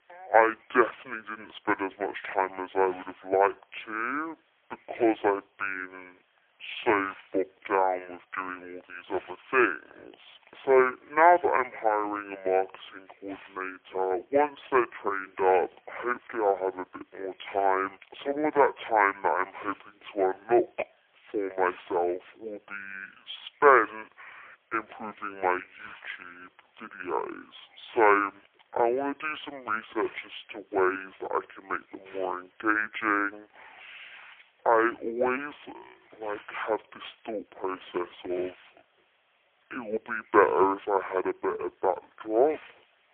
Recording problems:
phone-call audio; poor line; nothing above 3.5 kHz
wrong speed and pitch; too slow and too low; 0.6 times normal speed
hiss; faint; throughout; 25 dB below the speech

